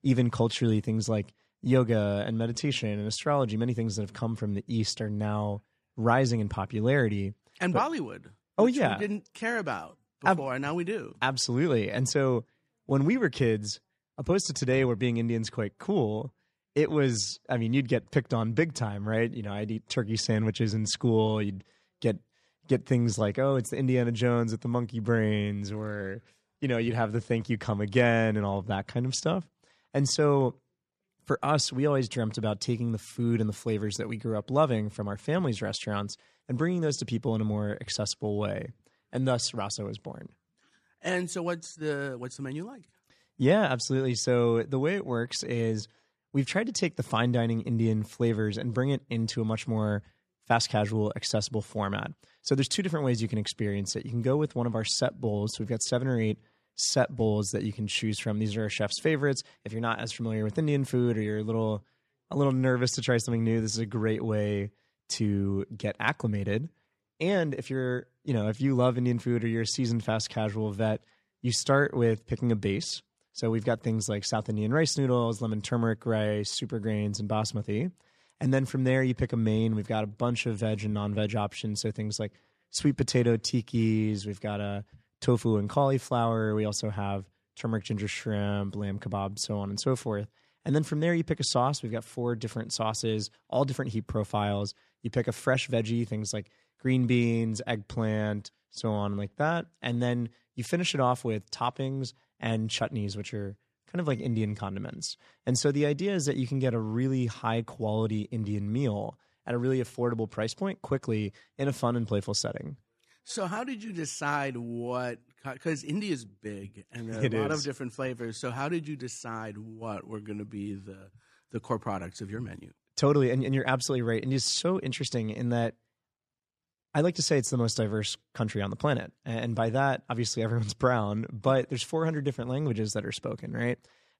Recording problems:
none

